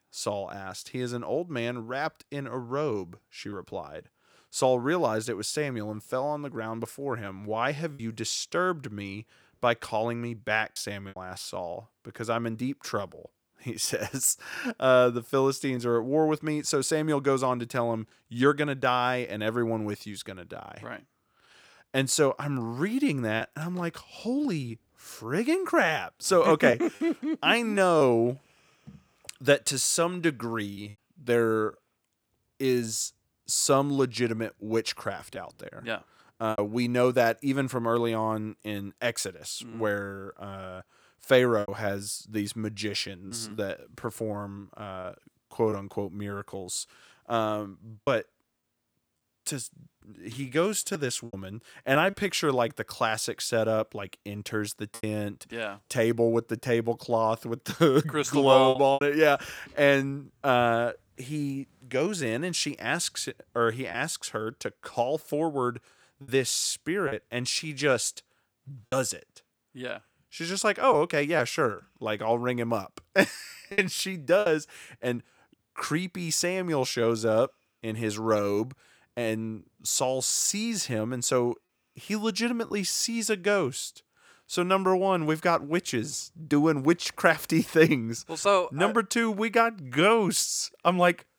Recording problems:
choppy; occasionally; 2% of the speech affected

